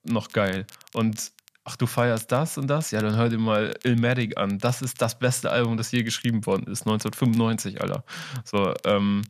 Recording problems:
crackle, like an old record; faint; 25 dB below the speech

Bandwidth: 14.5 kHz